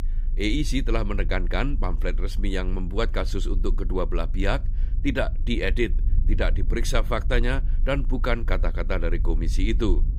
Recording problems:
low rumble; faint; throughout; 20 dB below the speech

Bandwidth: 15.5 kHz